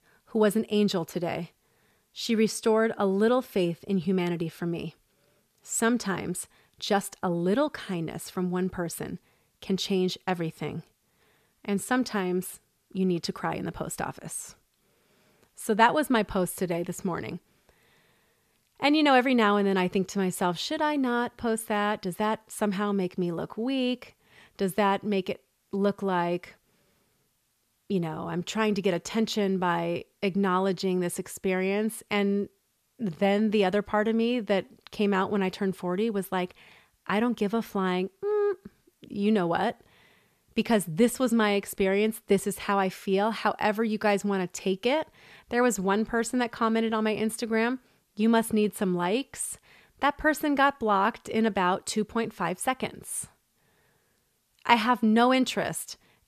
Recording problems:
none

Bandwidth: 14.5 kHz